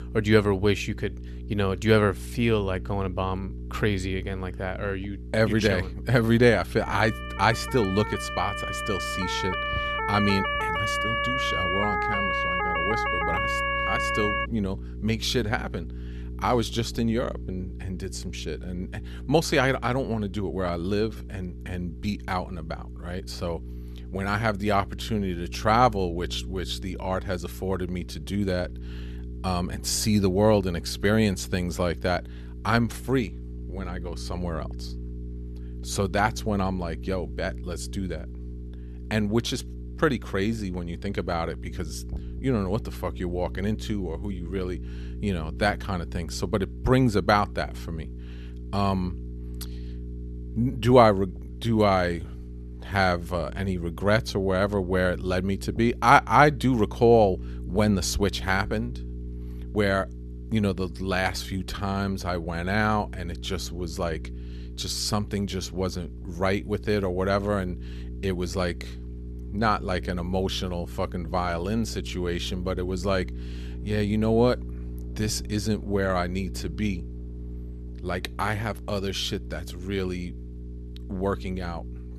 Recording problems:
electrical hum; faint; throughout; 60 Hz, 20 dB below the speech
siren; loud; from 7 to 14 s; peak 2 dB above the speech

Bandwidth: 13.5 kHz